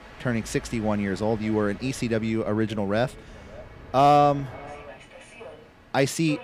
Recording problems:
echo of what is said; faint; throughout; 570 ms later, 25 dB below the speech
train or aircraft noise; faint; throughout; 20 dB below the speech

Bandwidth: 15.5 kHz